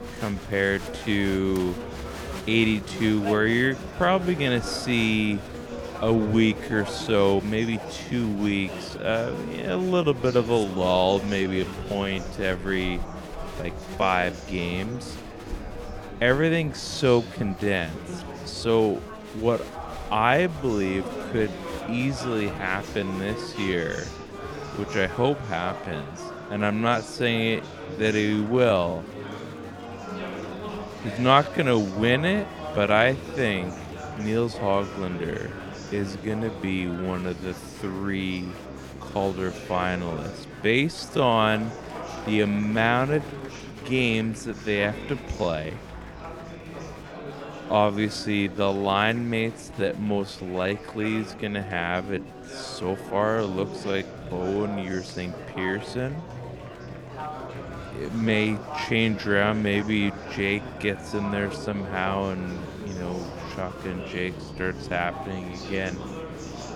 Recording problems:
wrong speed, natural pitch; too slow; 0.6 times normal speed
background music; noticeable; throughout; 20 dB below the speech
murmuring crowd; noticeable; throughout; 10 dB below the speech

